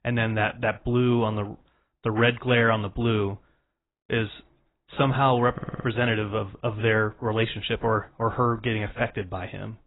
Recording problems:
garbled, watery; badly; nothing above 4 kHz
audio stuttering; at 5.5 s

